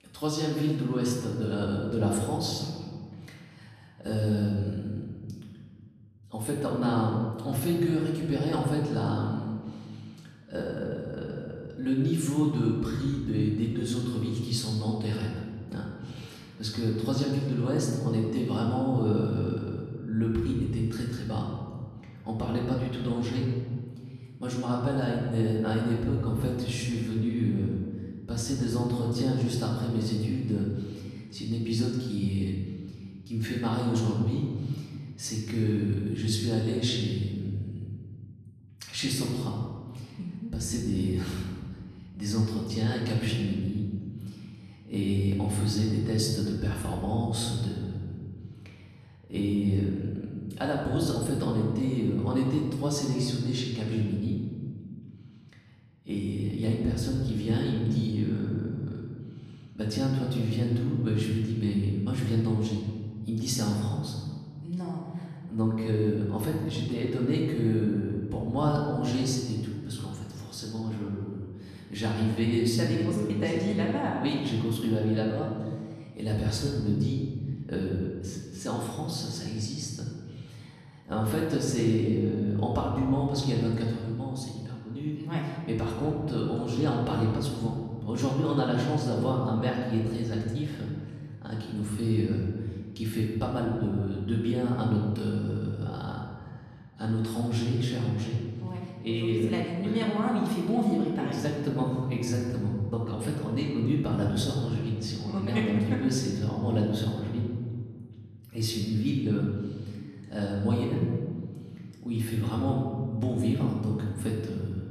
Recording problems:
off-mic speech; far
room echo; noticeable; dies away in 1.6 s

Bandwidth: 14 kHz